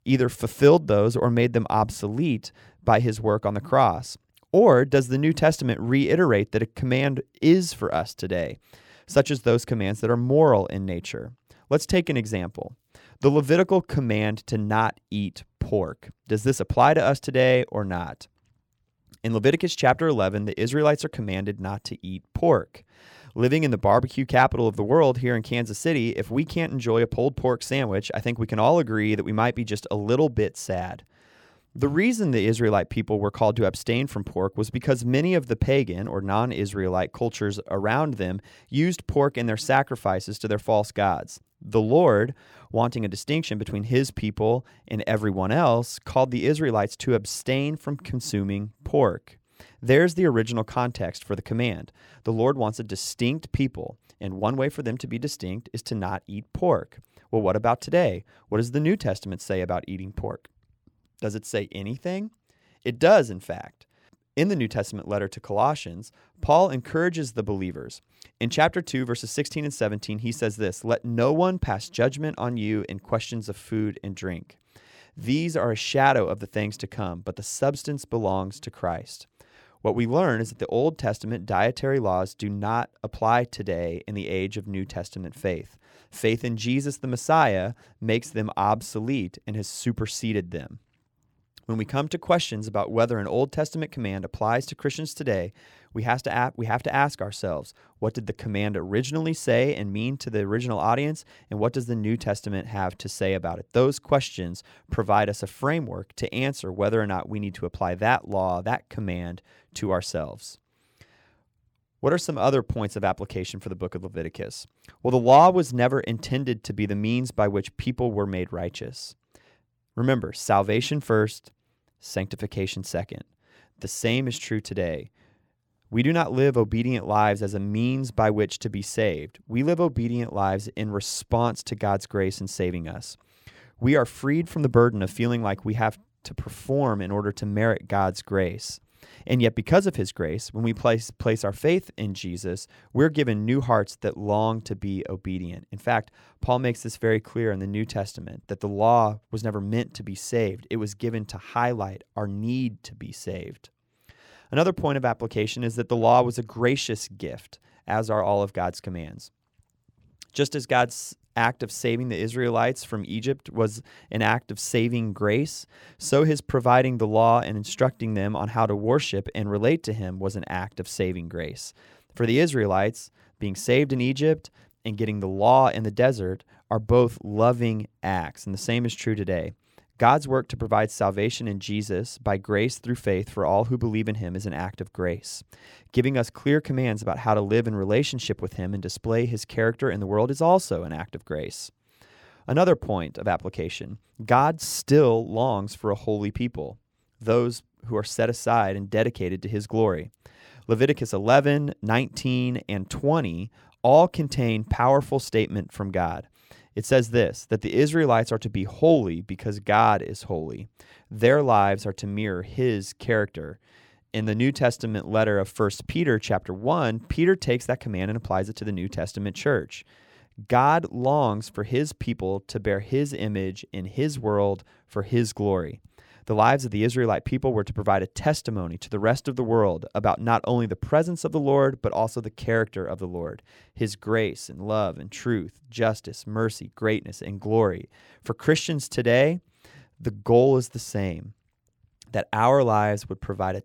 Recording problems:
none

